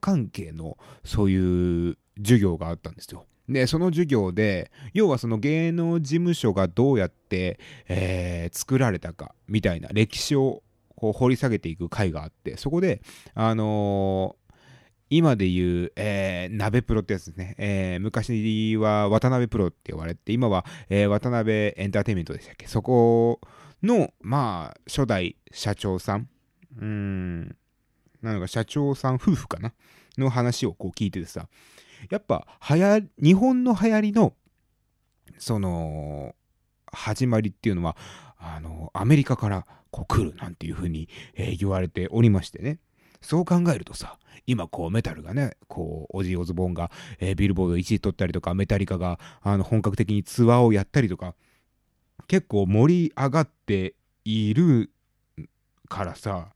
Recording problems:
none

